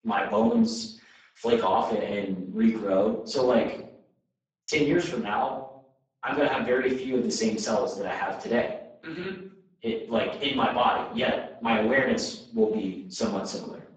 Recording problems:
off-mic speech; far
garbled, watery; badly; nothing above 7.5 kHz
room echo; noticeable; dies away in 0.6 s
thin; very slightly; fading below 250 Hz

